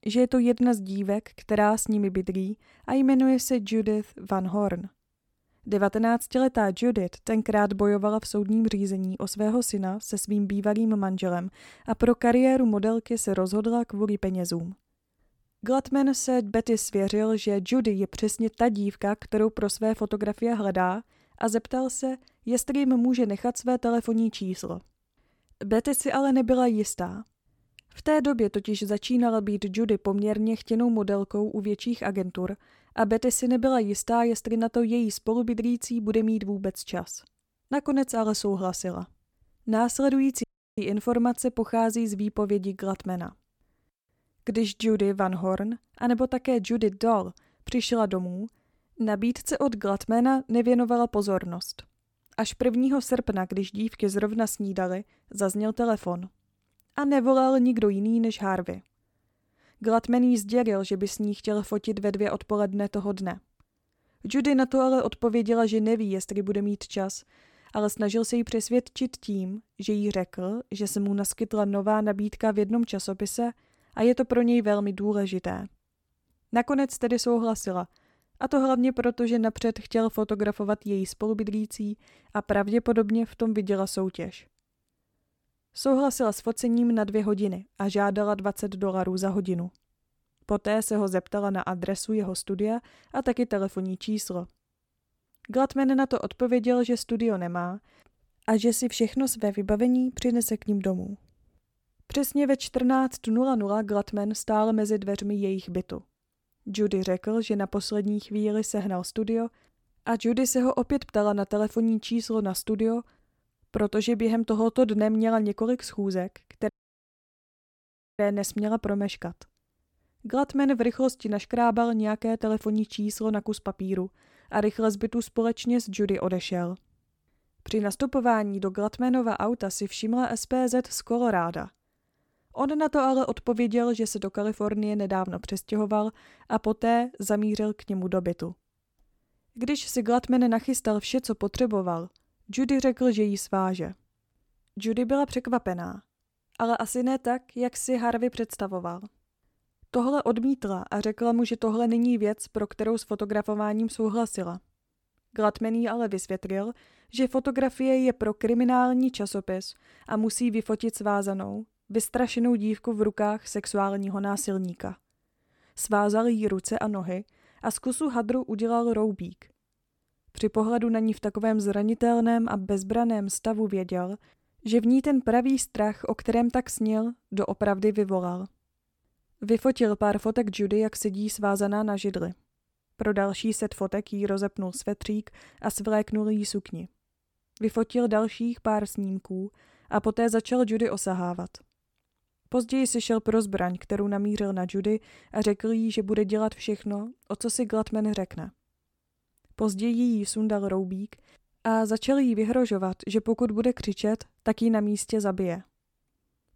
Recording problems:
audio cutting out; at 40 s and at 1:57 for 1.5 s

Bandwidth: 17.5 kHz